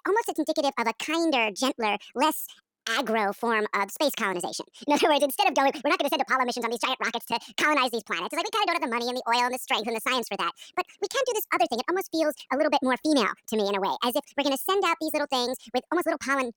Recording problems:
wrong speed and pitch; too fast and too high; 1.7 times normal speed

